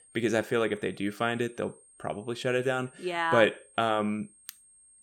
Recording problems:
high-pitched whine; faint; throughout; 8.5 kHz, 25 dB below the speech

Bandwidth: 18 kHz